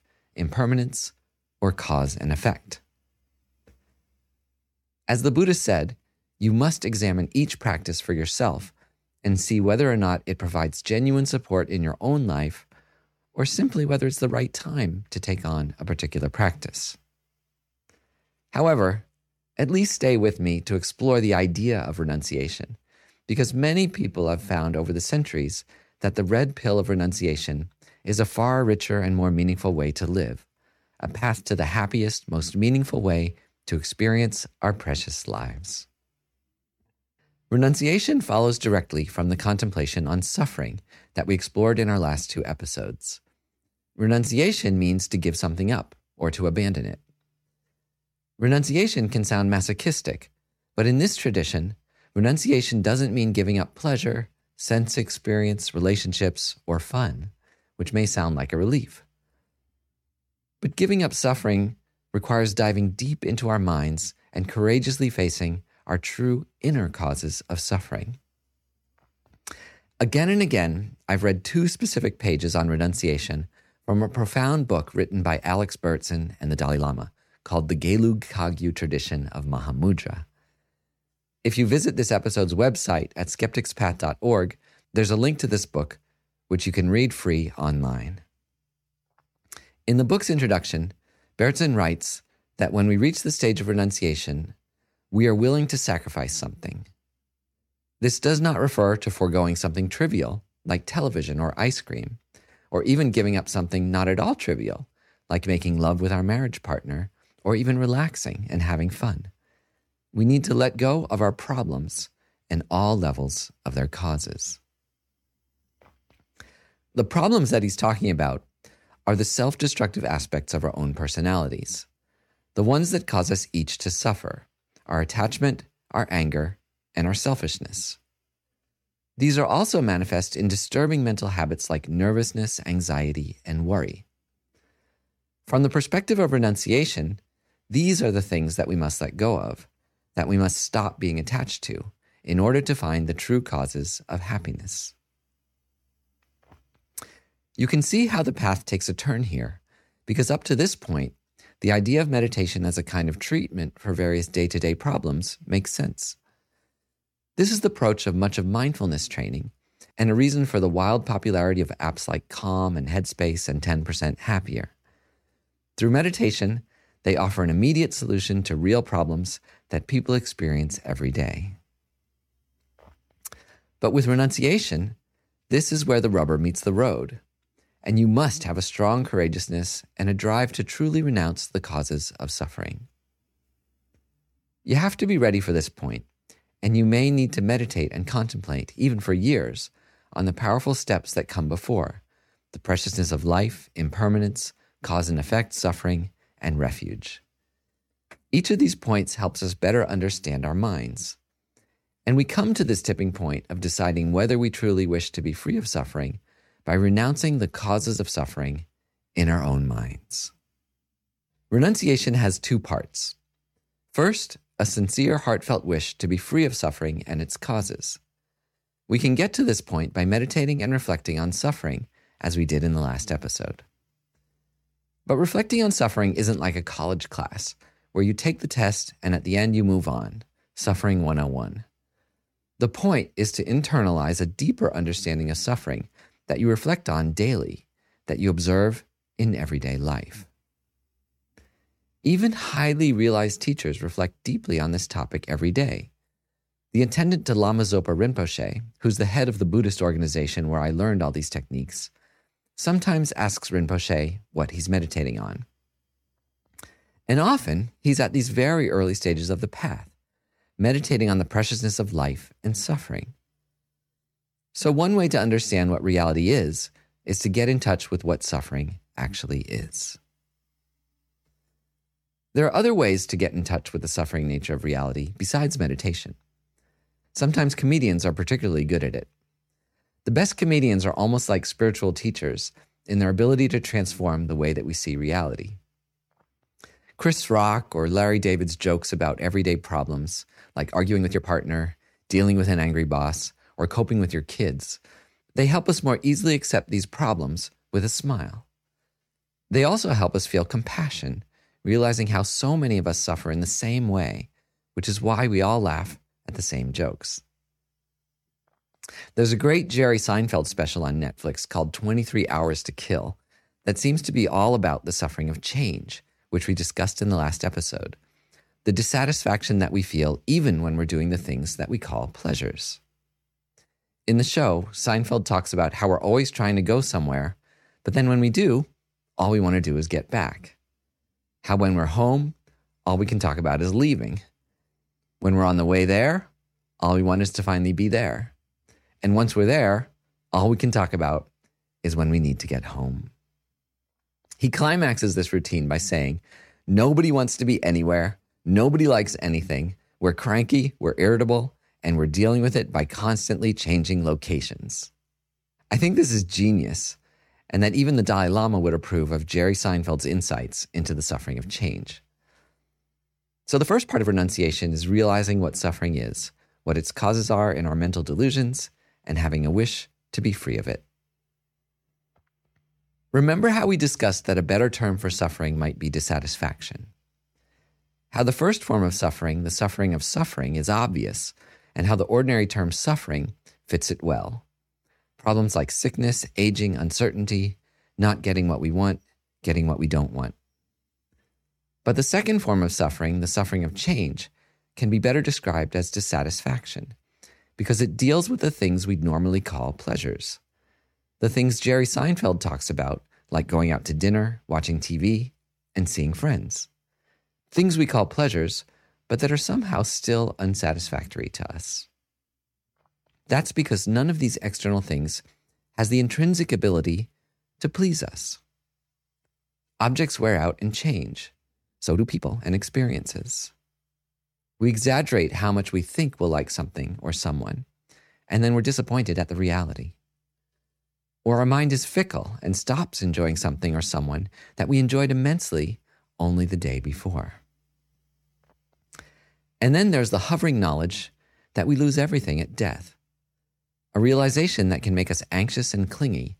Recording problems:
uneven, jittery; strongly; from 9 s to 7:09

